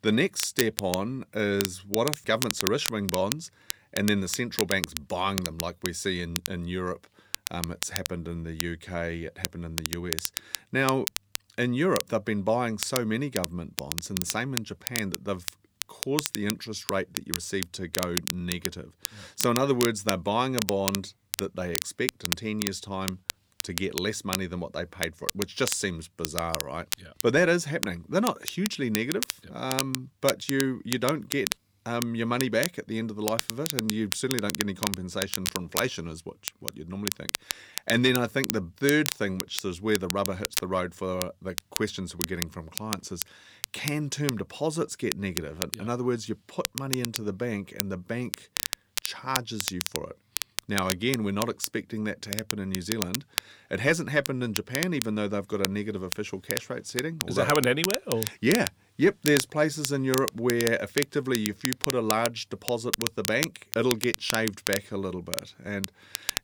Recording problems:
crackle, like an old record; loud; 4 dB below the speech

